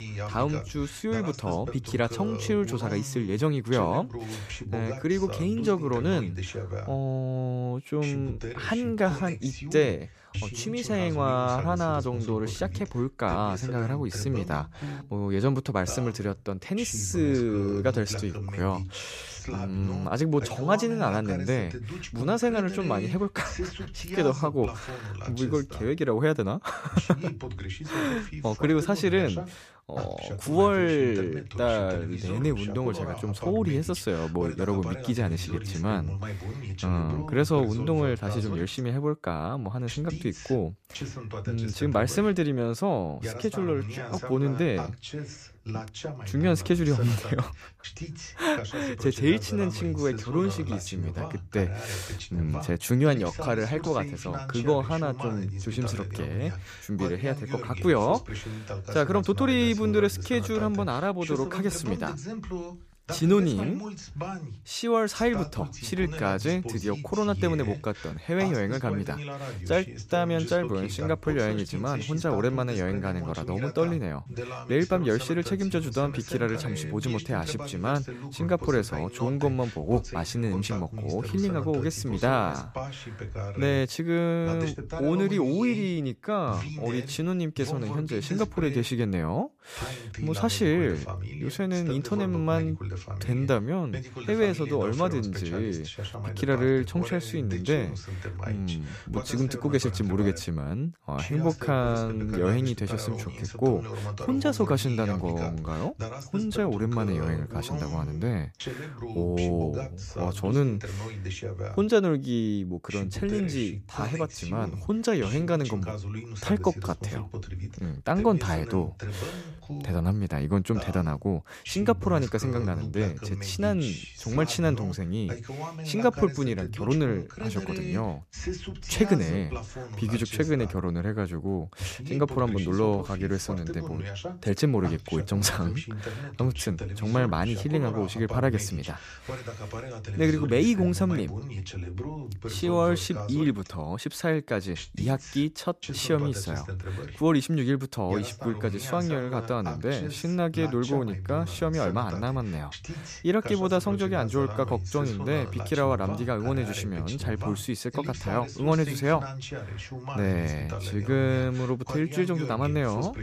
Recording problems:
voice in the background; loud; throughout; 9 dB below the speech

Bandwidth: 14.5 kHz